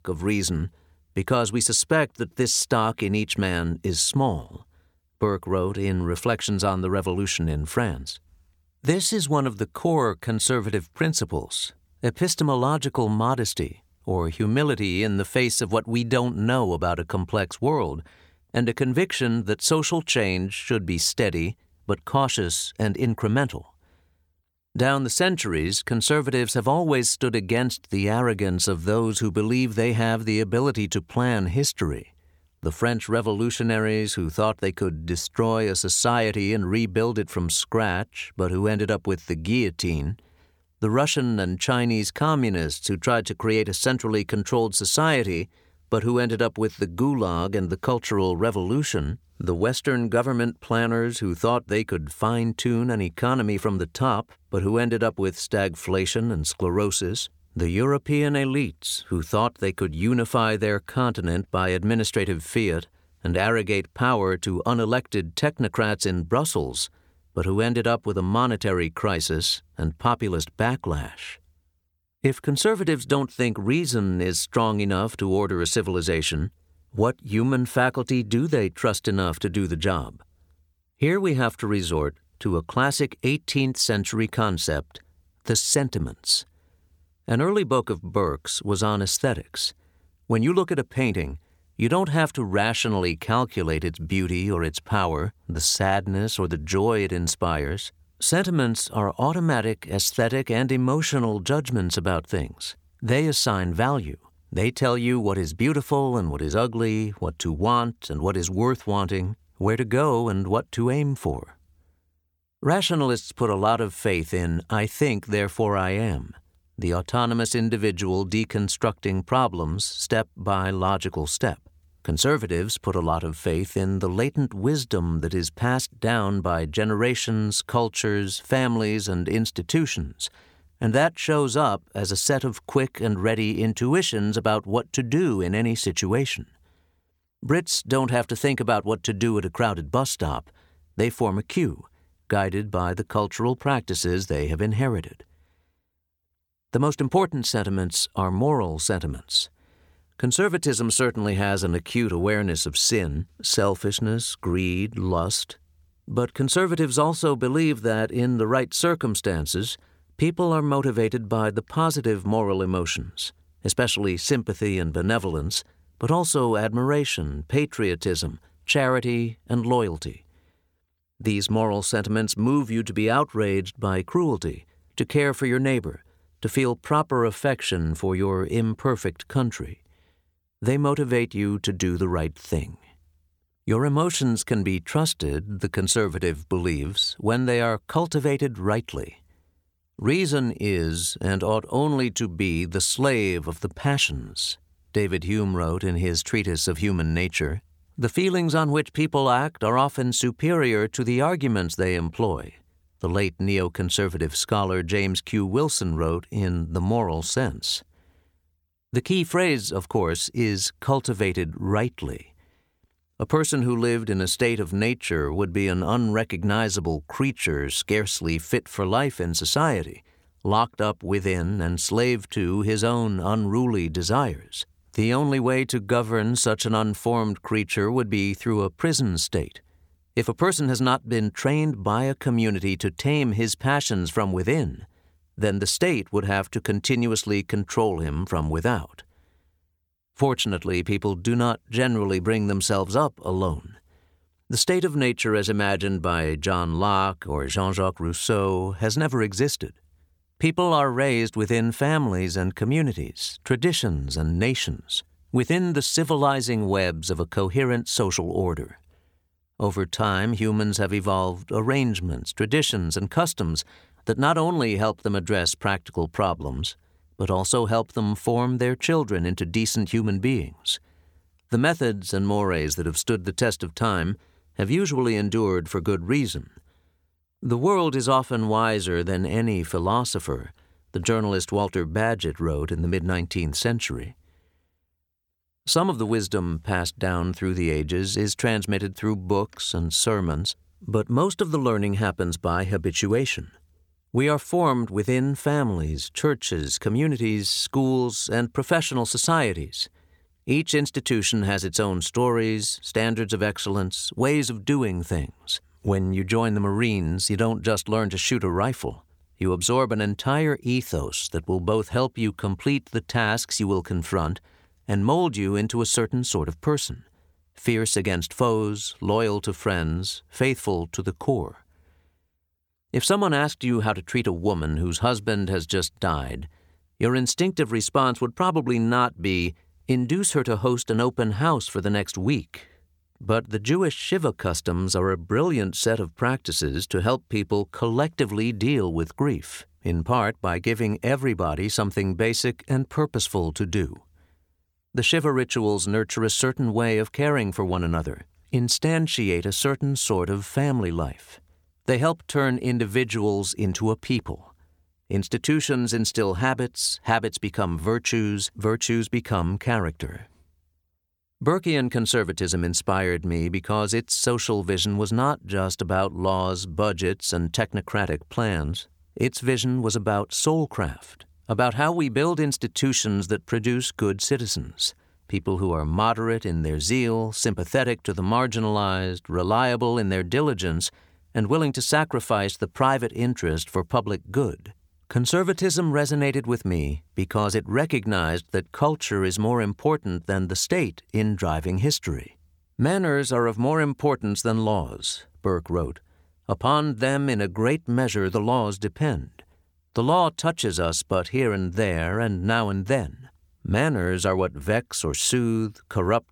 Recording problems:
none

